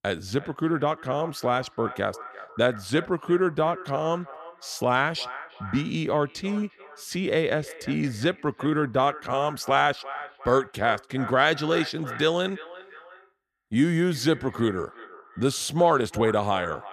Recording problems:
echo of what is said; noticeable; throughout; 350 ms later, 15 dB below the speech

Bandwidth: 14 kHz